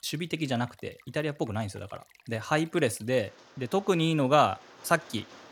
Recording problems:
rain or running water; faint; throughout; 25 dB below the speech

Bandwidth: 17 kHz